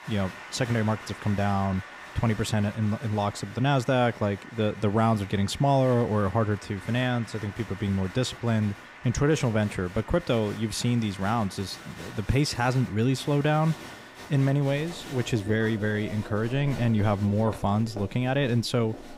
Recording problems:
crowd noise; noticeable; throughout; 15 dB below the speech

